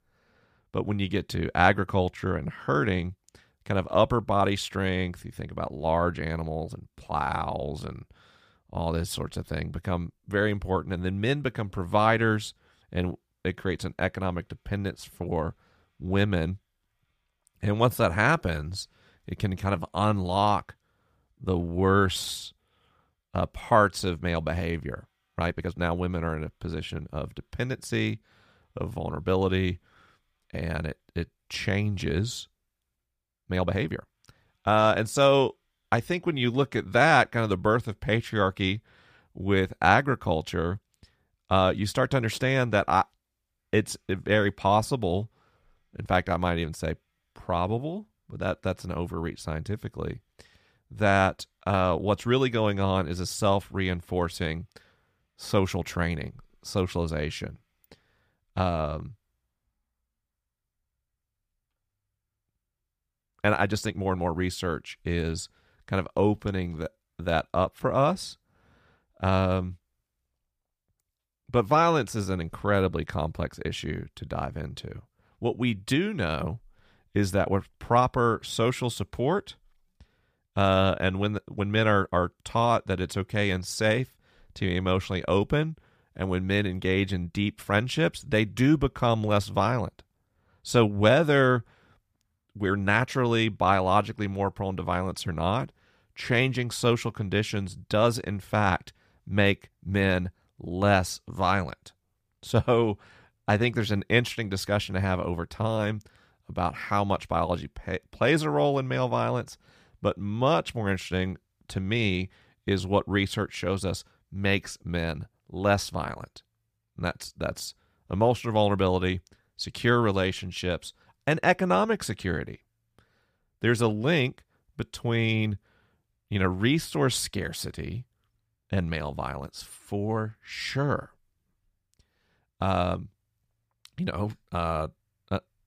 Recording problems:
uneven, jittery; strongly; from 7 s to 1:33

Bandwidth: 15 kHz